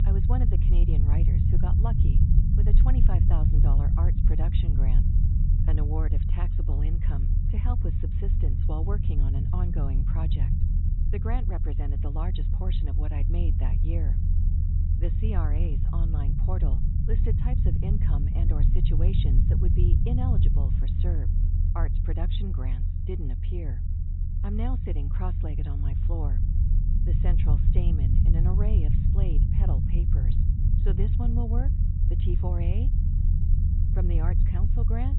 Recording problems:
high frequencies cut off; severe; nothing above 3.5 kHz
low rumble; loud; throughout; as loud as the speech

